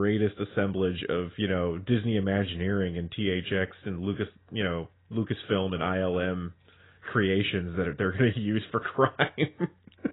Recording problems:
garbled, watery; badly; nothing above 3.5 kHz
abrupt cut into speech; at the start

